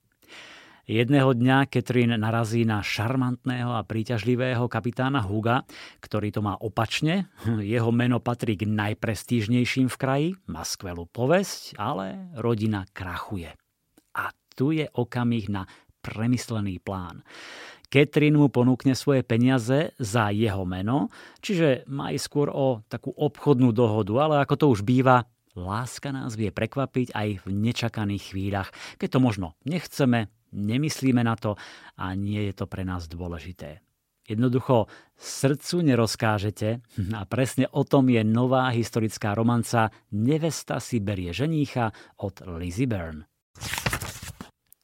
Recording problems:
none

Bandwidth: 16 kHz